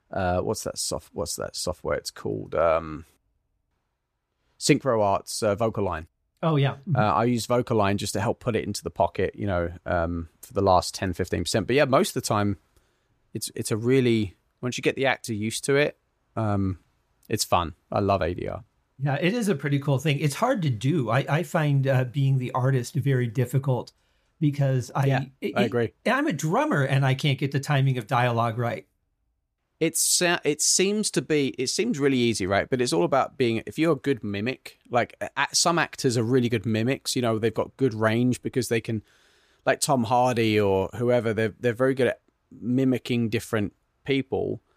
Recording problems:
none

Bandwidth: 14.5 kHz